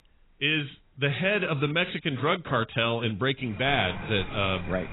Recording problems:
garbled, watery; badly; nothing above 3.5 kHz
animal sounds; noticeable; throughout; 15 dB below the speech

